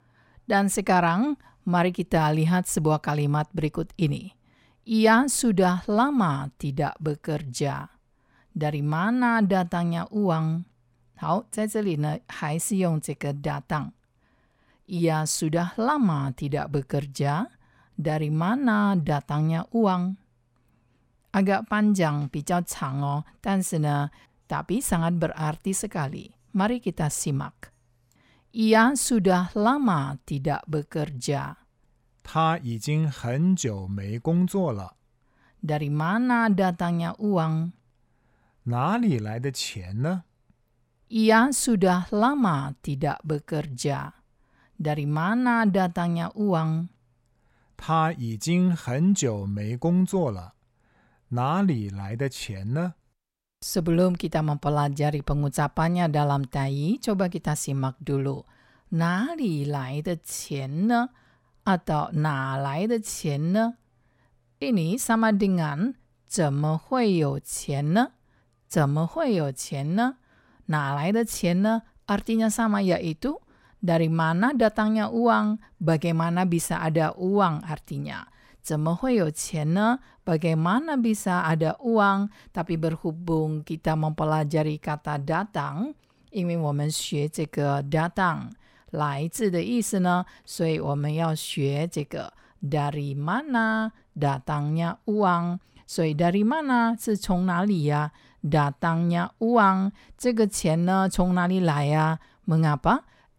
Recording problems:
none

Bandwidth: 16.5 kHz